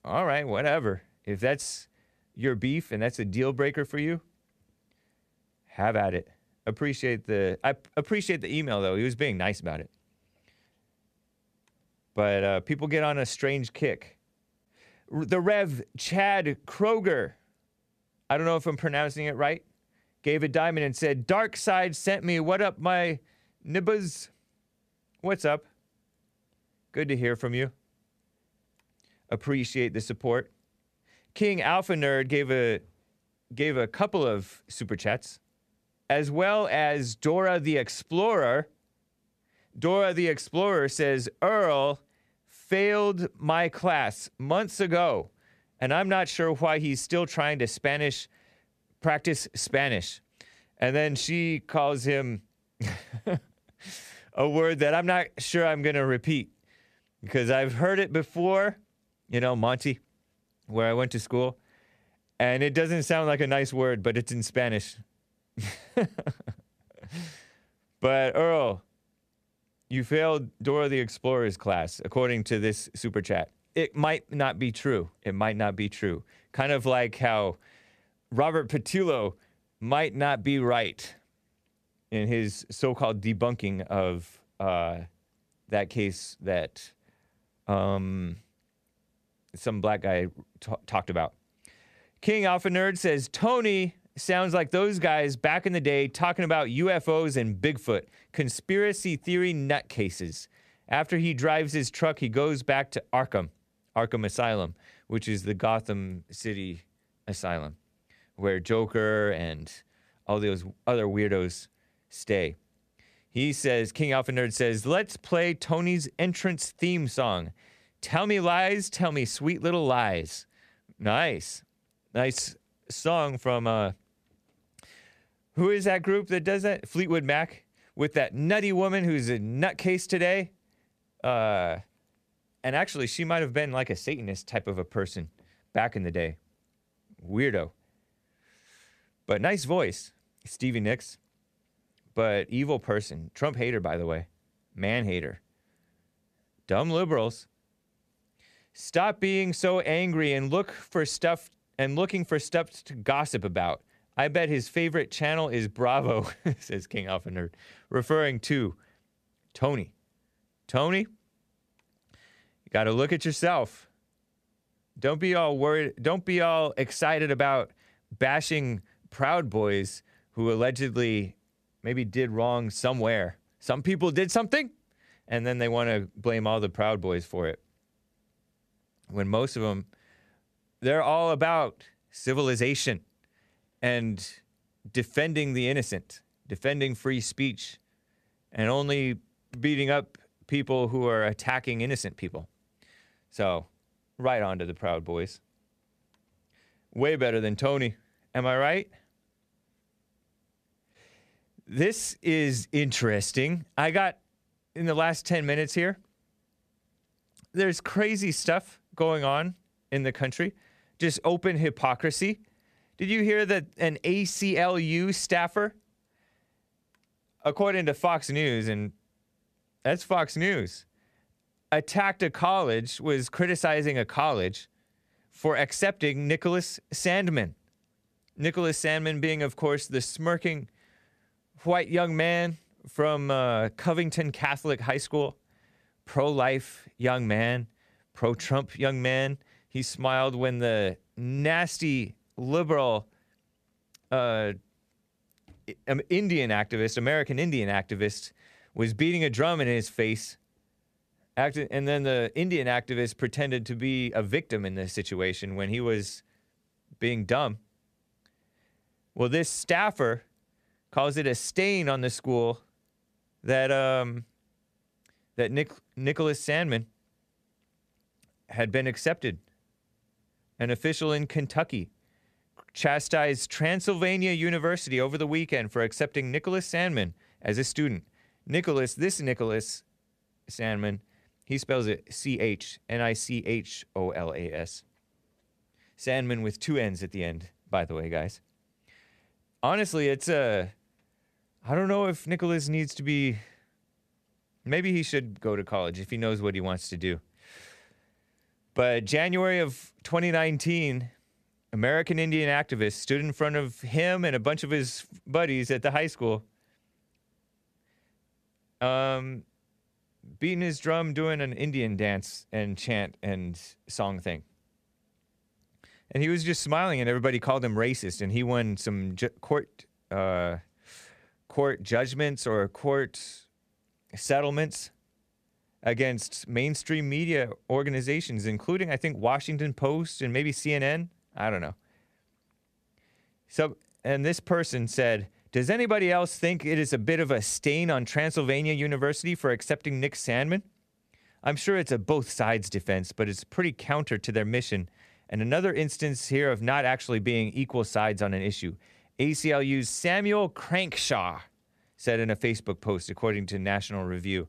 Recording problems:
none

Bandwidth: 14.5 kHz